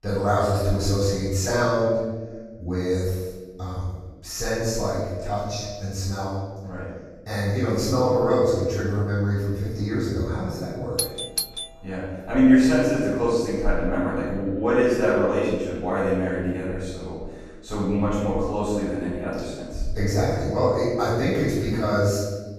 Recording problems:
room echo; strong; dies away in 1.2 s
off-mic speech; far
doorbell; noticeable; at 11 s; peak 2 dB below the speech

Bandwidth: 14.5 kHz